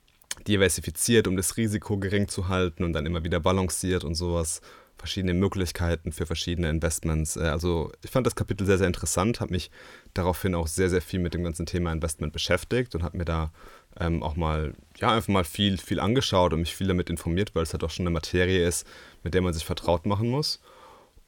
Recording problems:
none

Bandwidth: 17 kHz